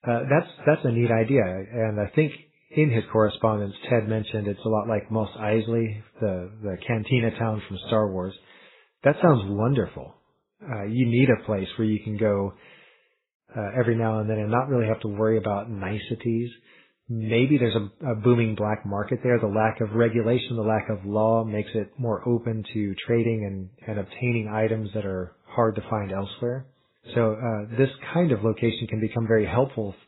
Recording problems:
garbled, watery; badly; nothing above 4 kHz

